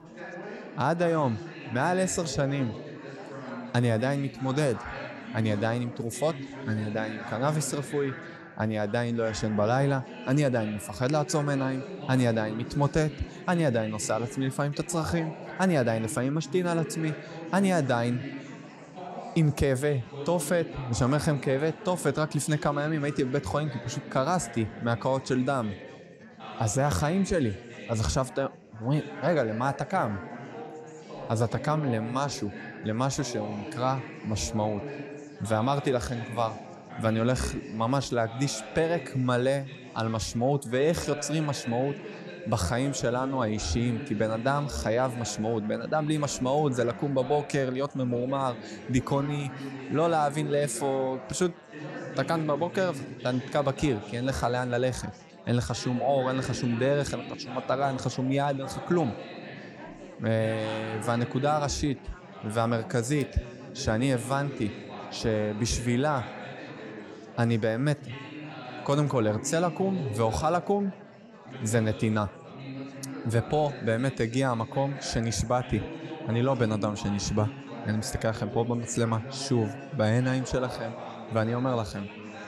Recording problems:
chatter from many people; noticeable; throughout; 10 dB below the speech

